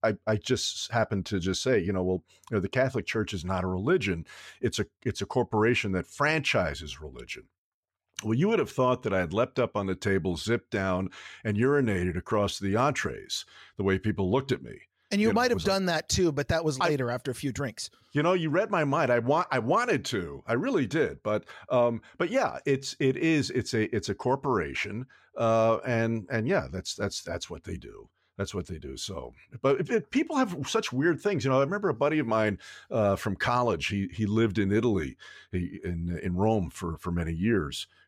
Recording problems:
none

